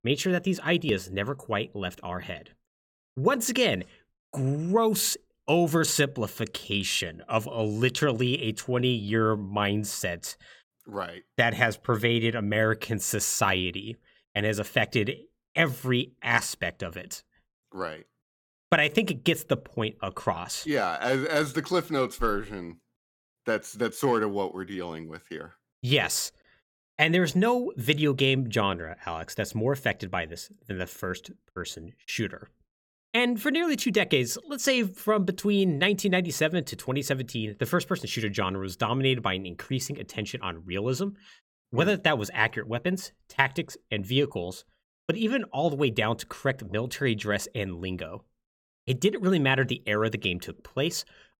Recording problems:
none

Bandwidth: 17.5 kHz